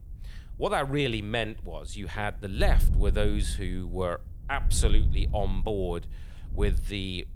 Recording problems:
wind noise on the microphone; occasional gusts; 15 dB below the speech

